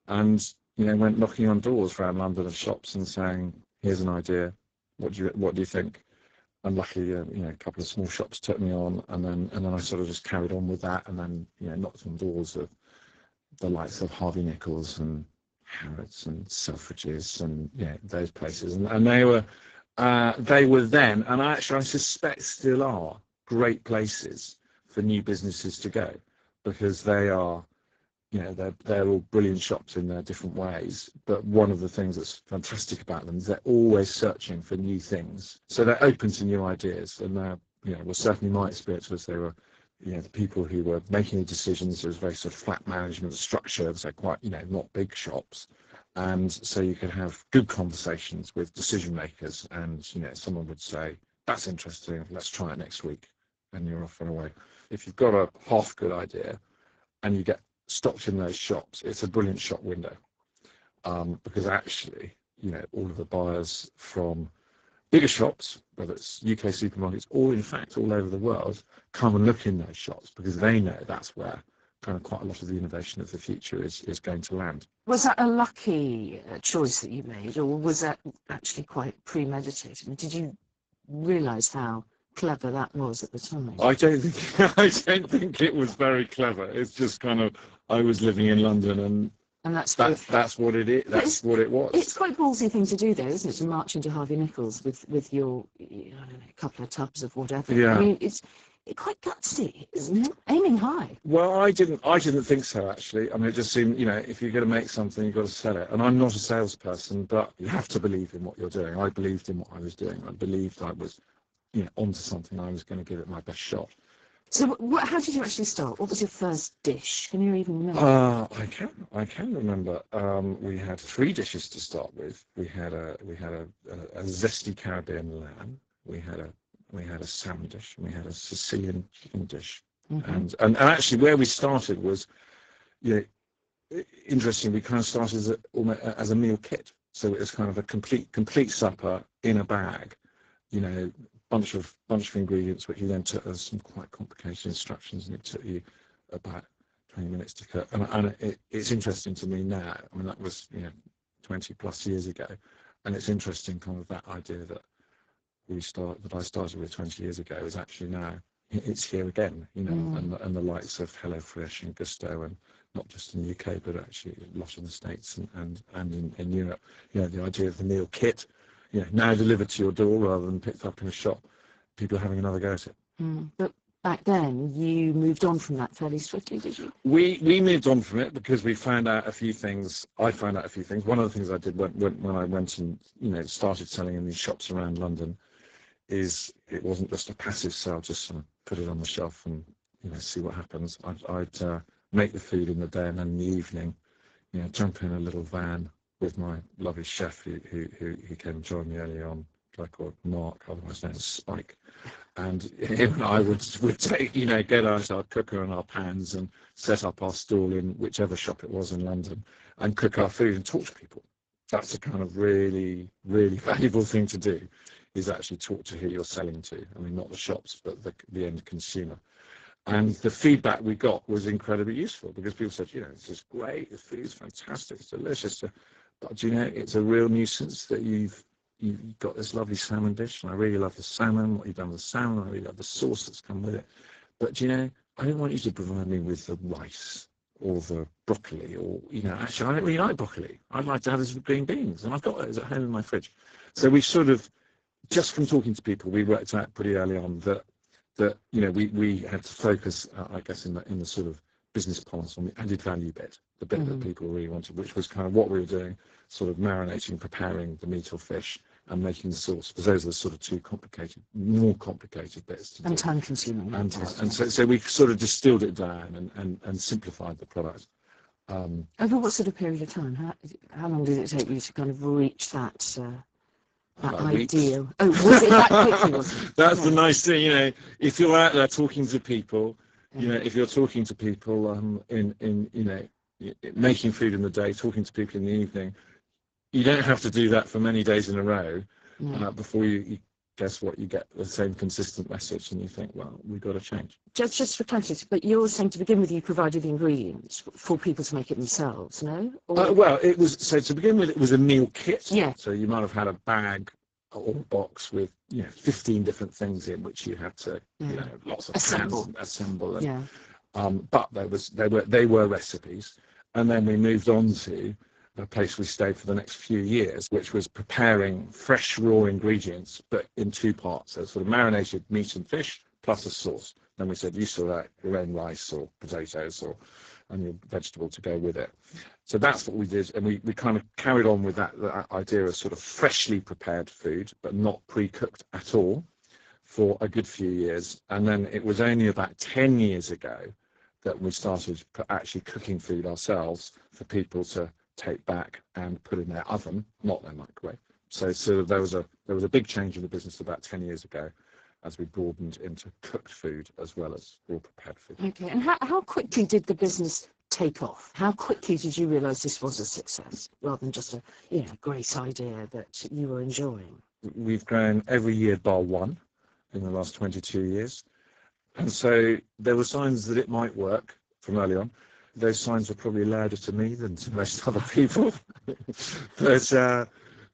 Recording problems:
garbled, watery; badly; nothing above 7.5 kHz

